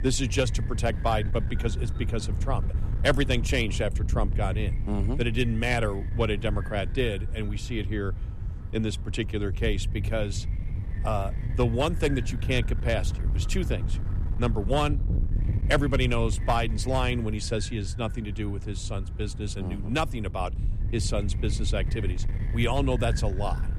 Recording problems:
wind noise on the microphone; occasional gusts; 15 dB below the speech

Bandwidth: 14 kHz